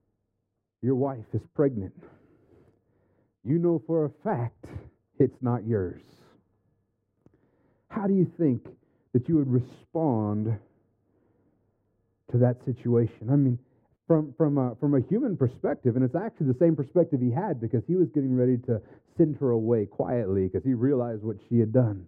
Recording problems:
muffled; very; fading above 1 kHz

